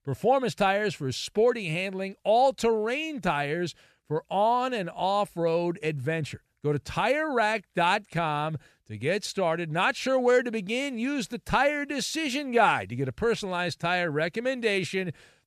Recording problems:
none

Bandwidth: 14 kHz